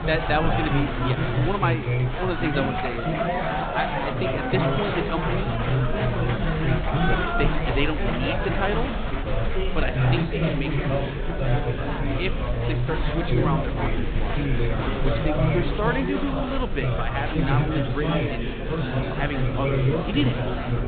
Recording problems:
high frequencies cut off; severe; nothing above 4 kHz
chatter from many people; very loud; throughout; 4 dB above the speech
low rumble; faint; throughout; 25 dB below the speech

